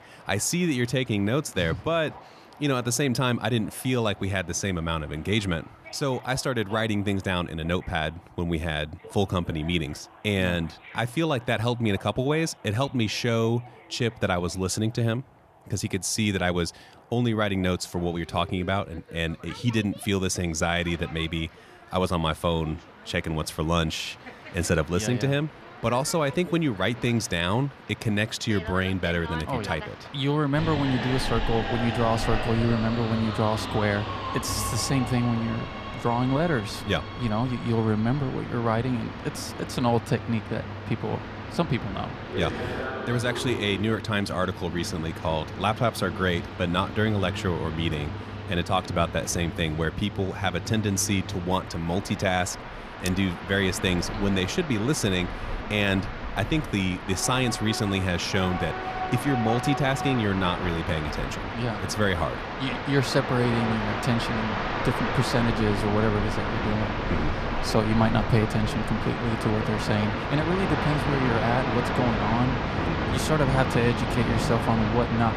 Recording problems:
train or aircraft noise; loud; throughout; 5 dB below the speech

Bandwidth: 14 kHz